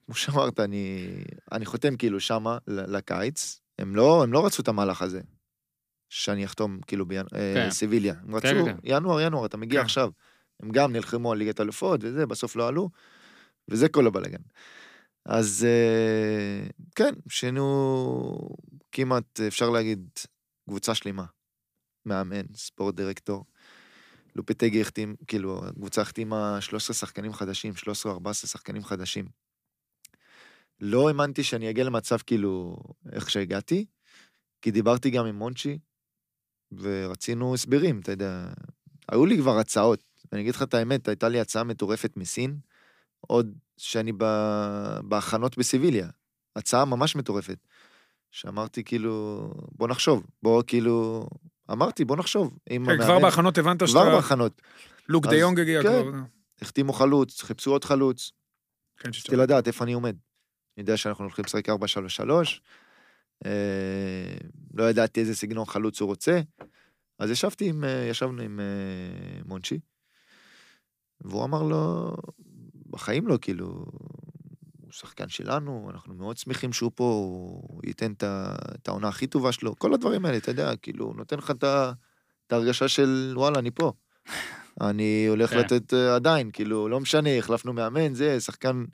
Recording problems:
none

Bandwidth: 15 kHz